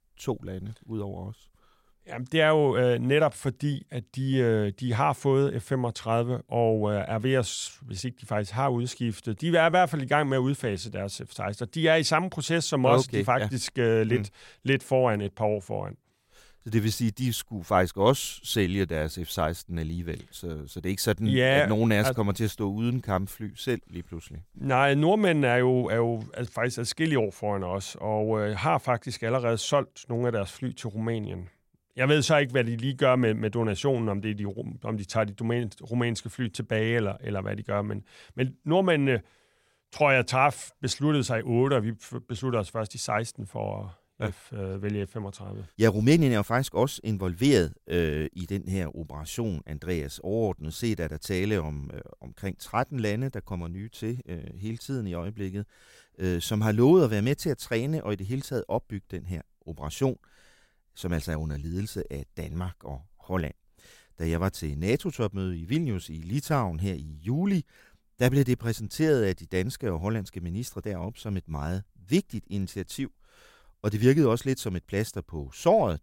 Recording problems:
none

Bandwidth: 16 kHz